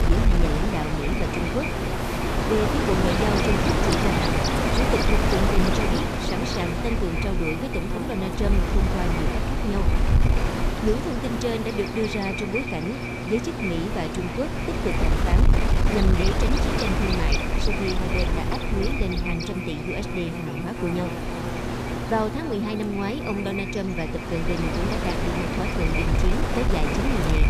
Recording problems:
echo of what is said; strong; throughout; 300 ms later, 8 dB below the speech
wind noise on the microphone; heavy; 2 dB above the speech
electrical hum; loud; throughout; 60 Hz, 6 dB below the speech
rain or running water; noticeable; throughout; 15 dB below the speech
dog barking; noticeable; from 1.5 to 5 s; peak 7 dB below the speech

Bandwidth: 14.5 kHz